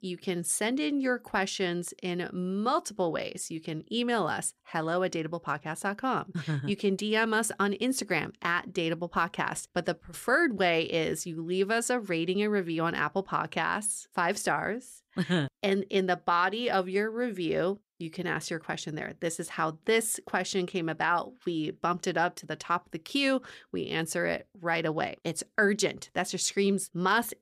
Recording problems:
none

